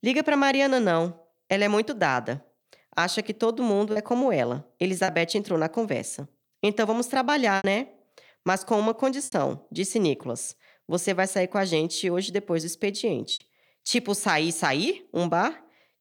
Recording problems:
choppy; occasionally; 3% of the speech affected

